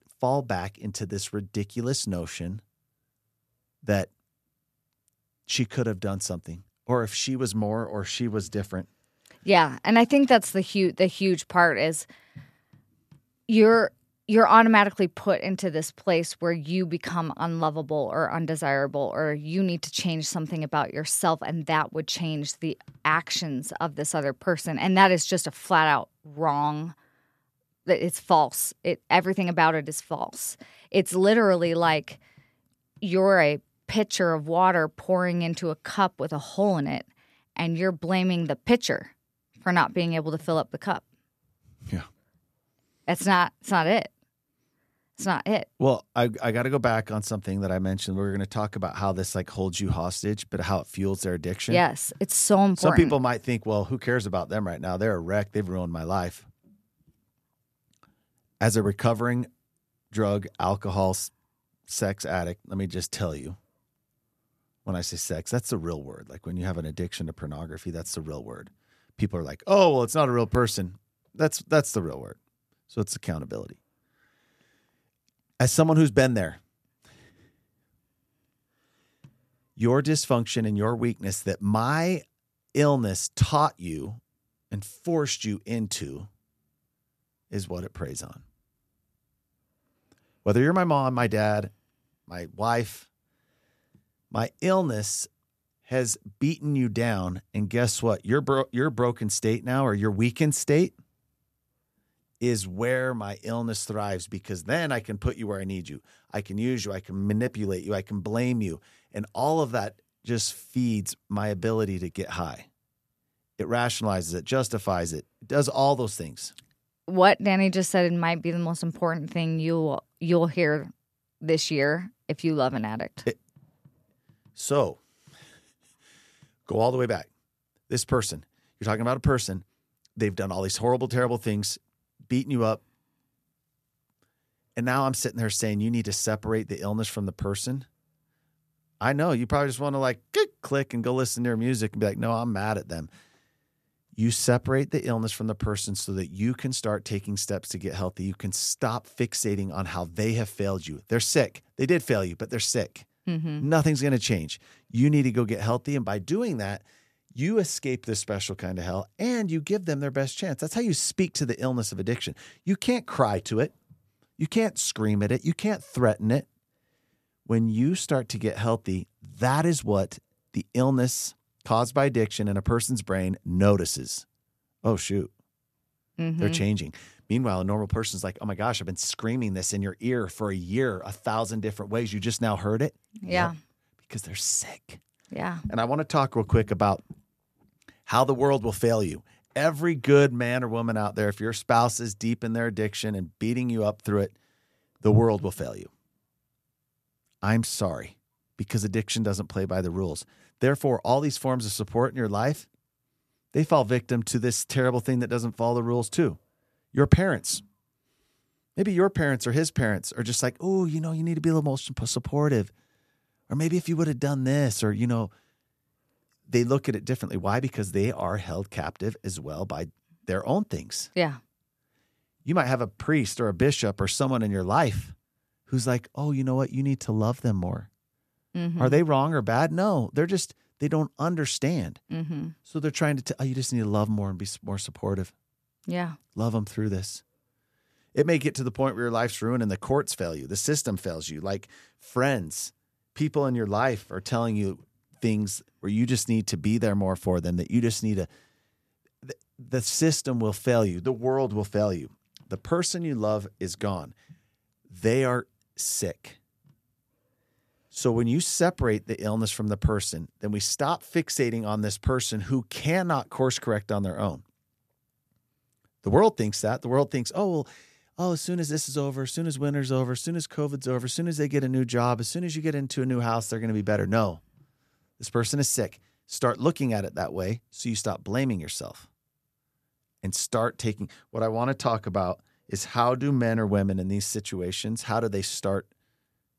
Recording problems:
none

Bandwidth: 14 kHz